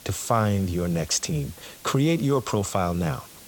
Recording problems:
hiss; noticeable; throughout; 20 dB below the speech

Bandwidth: 17.5 kHz